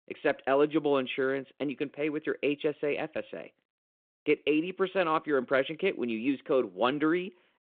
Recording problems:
phone-call audio

